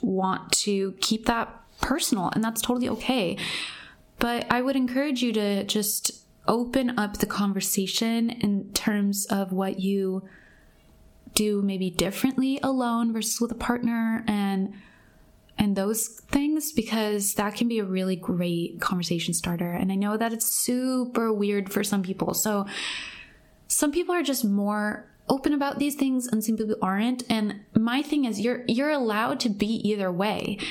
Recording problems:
squashed, flat; somewhat

